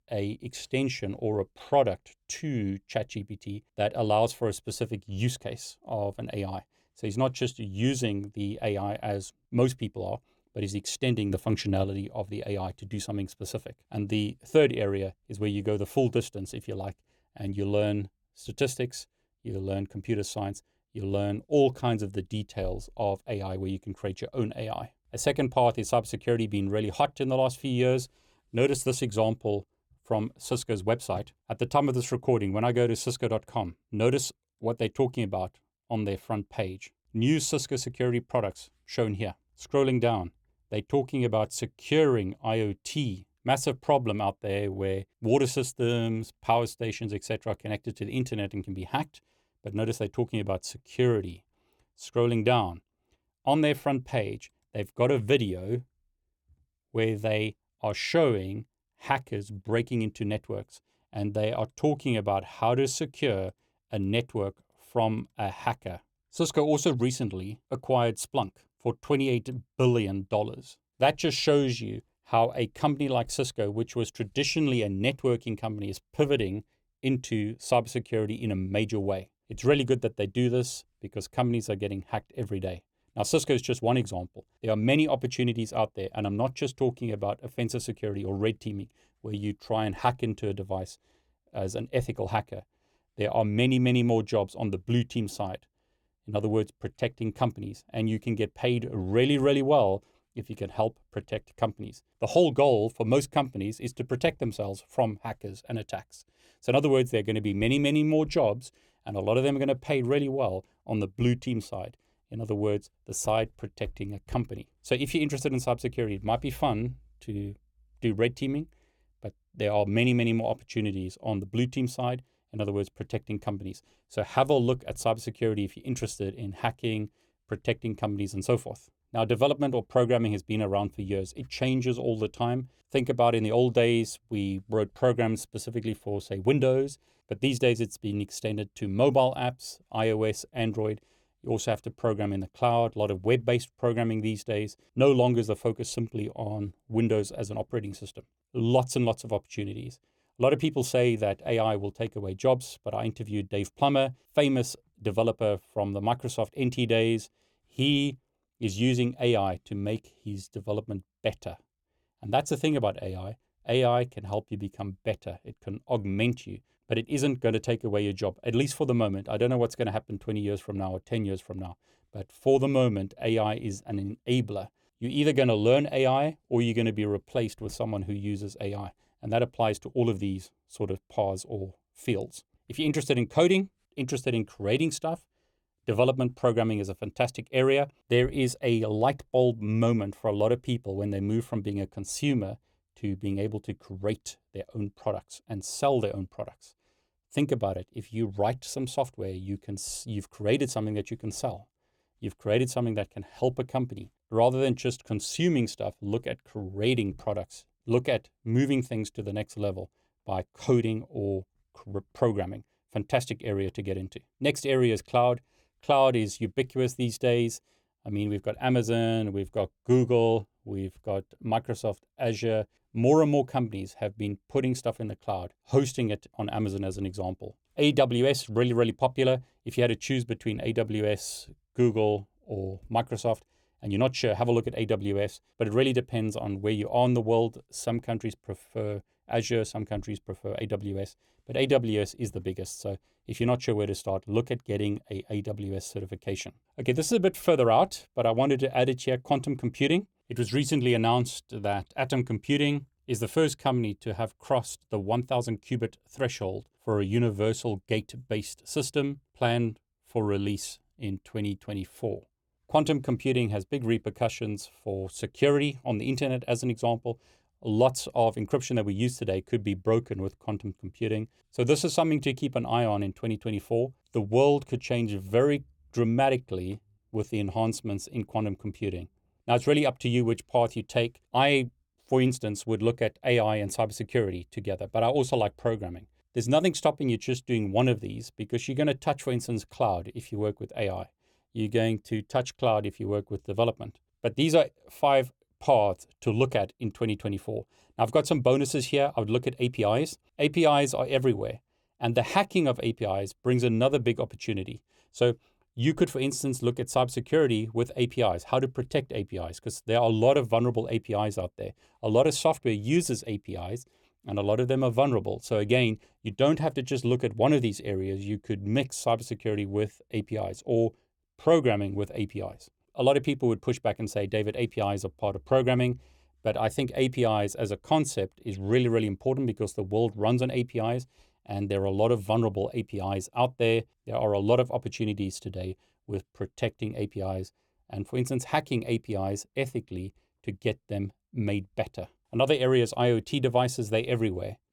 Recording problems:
none

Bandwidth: 18 kHz